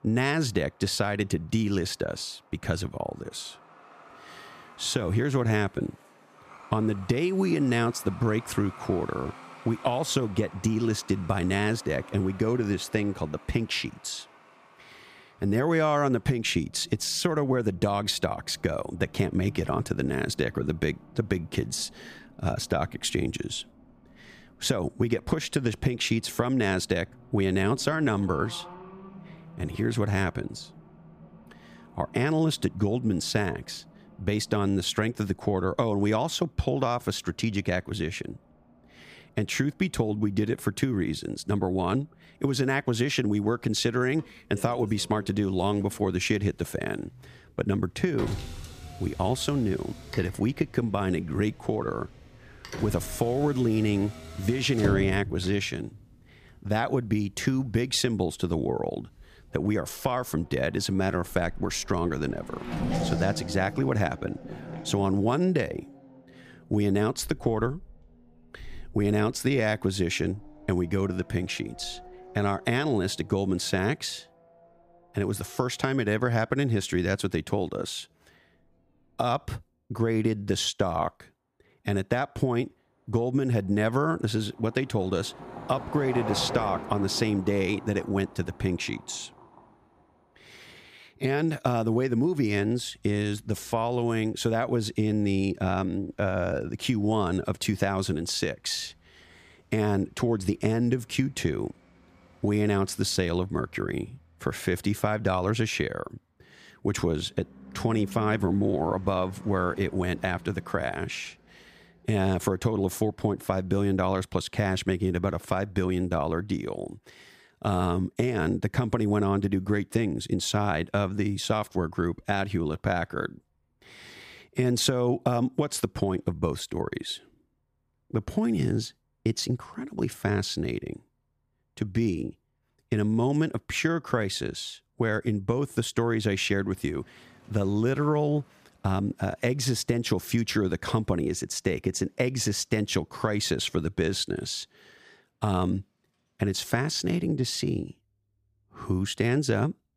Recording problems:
traffic noise; noticeable; throughout; 15 dB below the speech

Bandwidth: 14.5 kHz